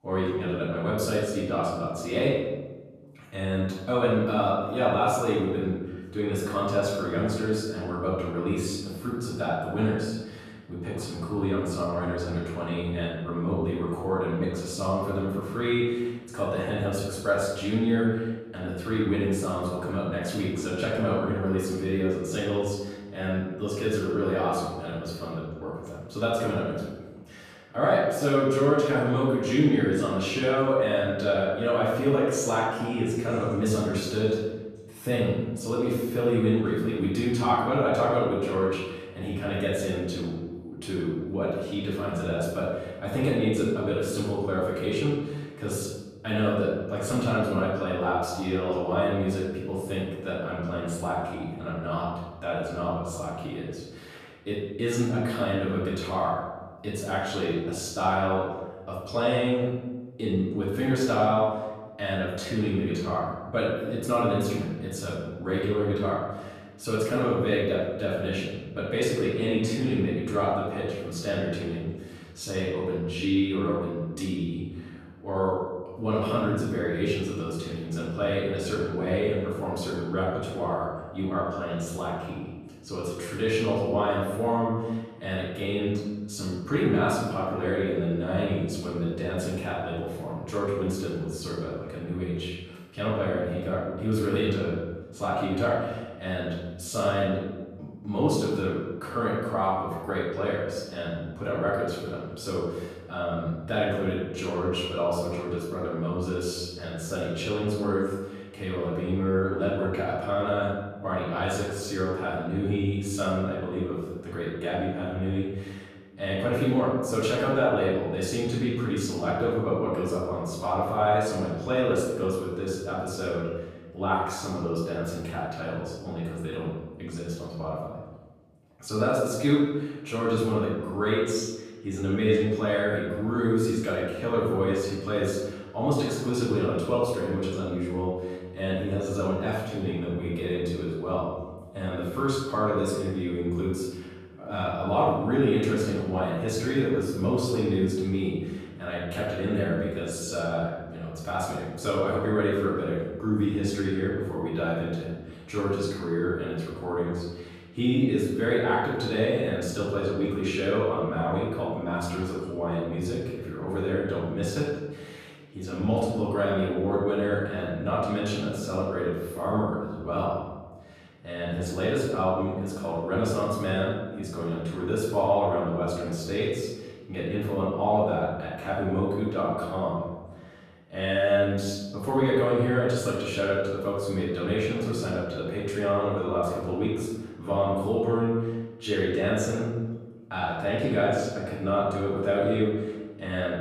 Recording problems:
off-mic speech; far
room echo; noticeable; dies away in 1.2 s

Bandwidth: 14.5 kHz